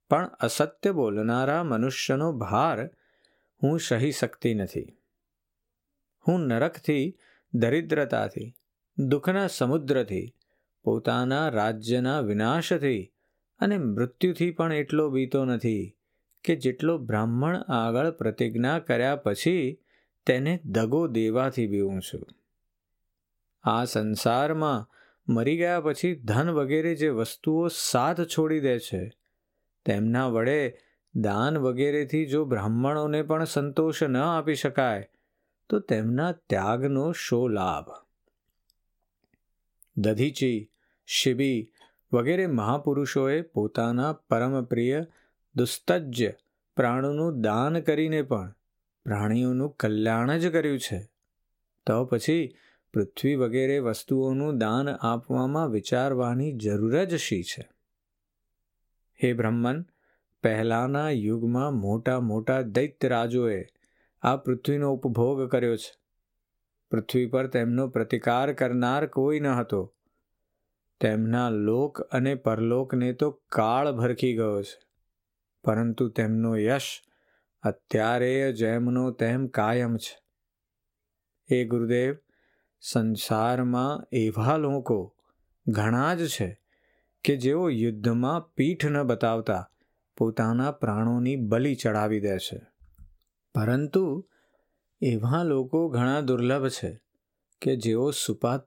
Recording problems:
squashed, flat; somewhat

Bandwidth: 16.5 kHz